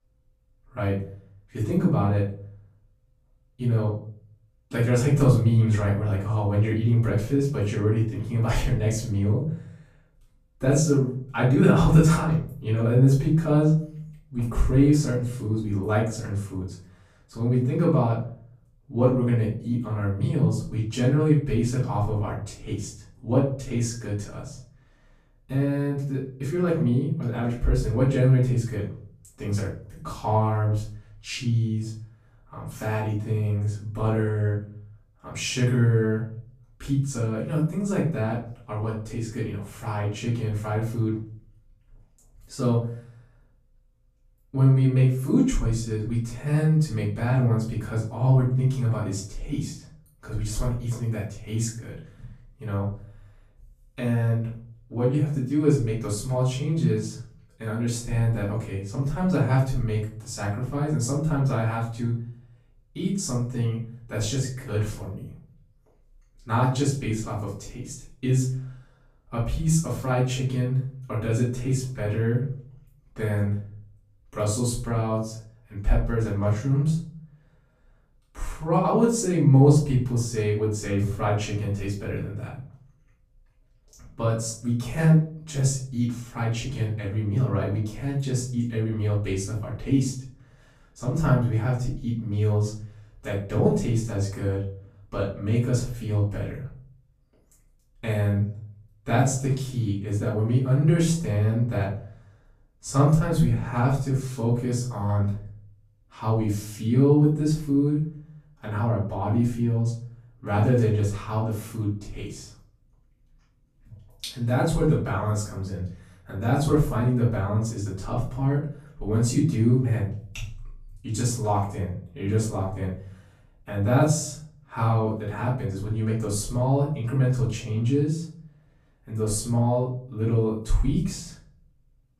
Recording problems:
off-mic speech; far
room echo; noticeable; dies away in 0.5 s

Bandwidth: 14.5 kHz